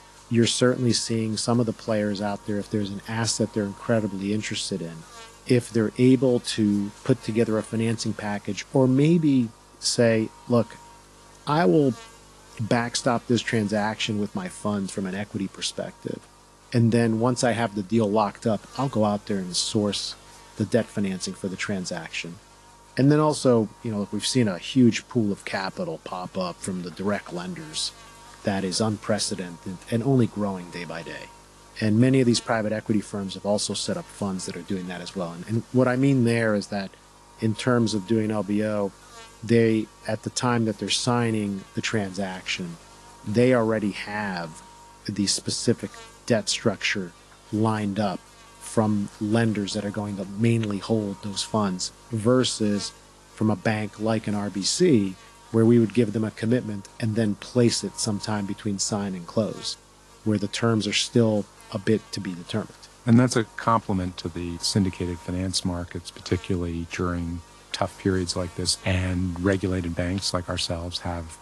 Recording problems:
garbled, watery; slightly
electrical hum; faint; throughout; 50 Hz, 20 dB below the speech

